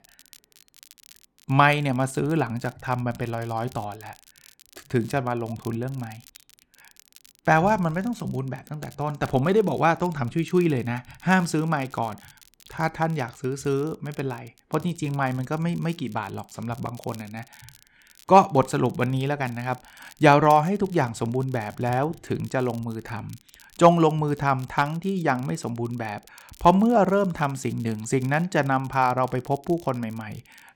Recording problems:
crackle, like an old record; faint; 25 dB below the speech

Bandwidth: 17 kHz